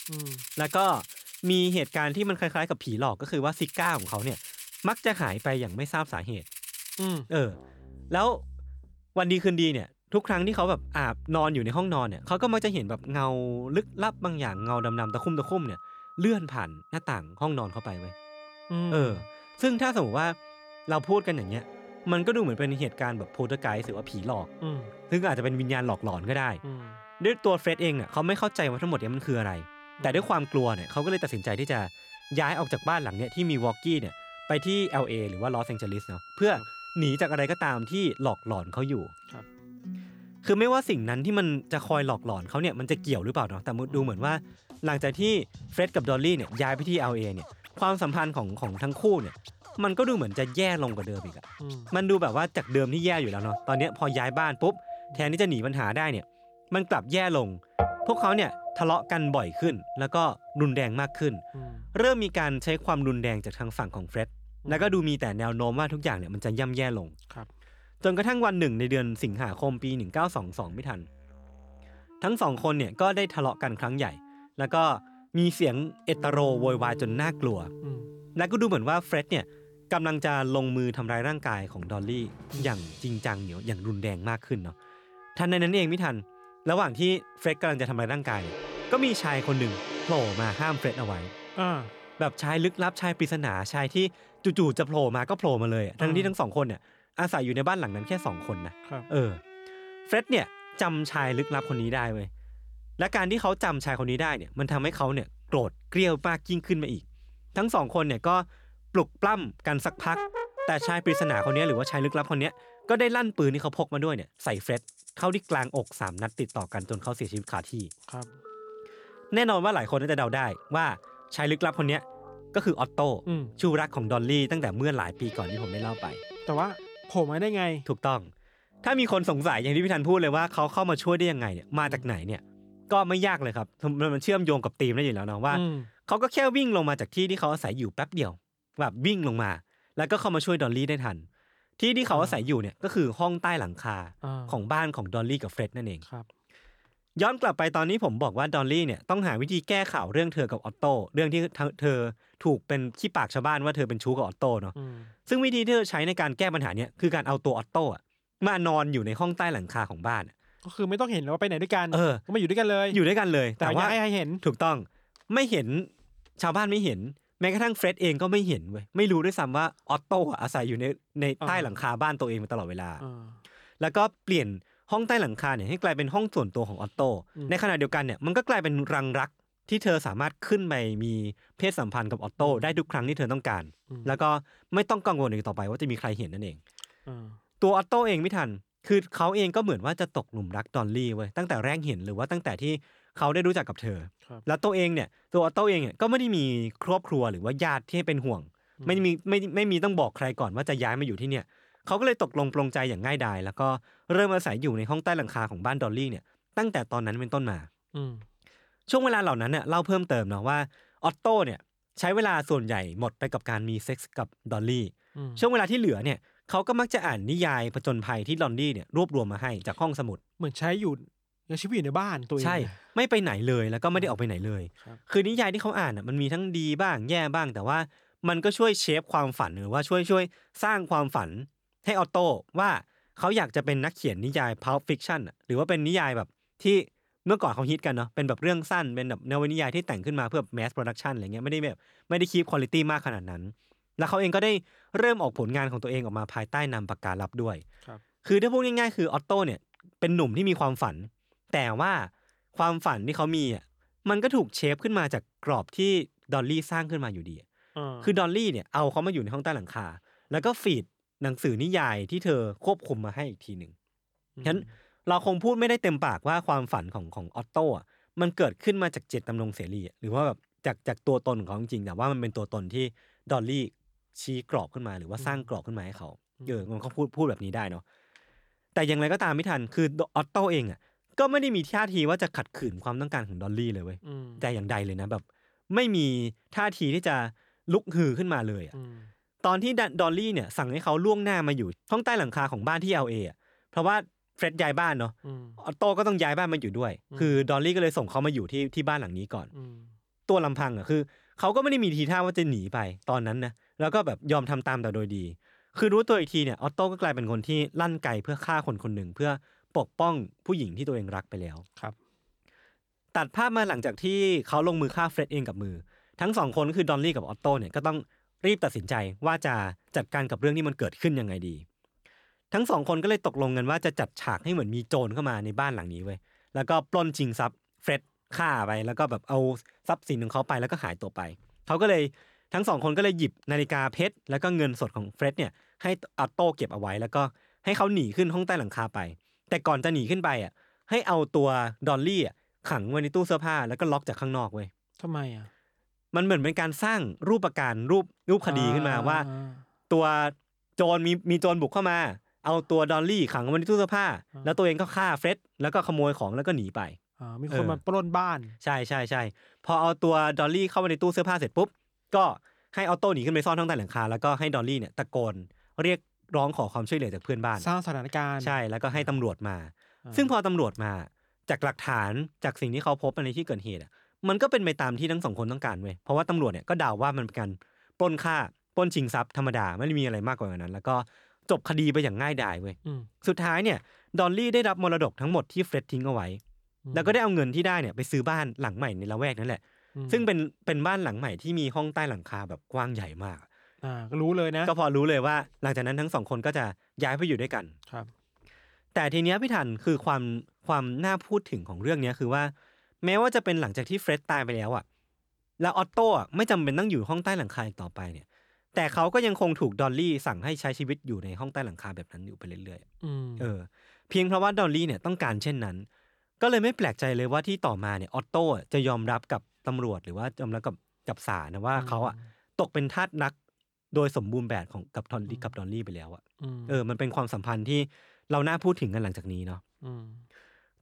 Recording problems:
background music; noticeable; until 2:13; 15 dB below the speech

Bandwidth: 18.5 kHz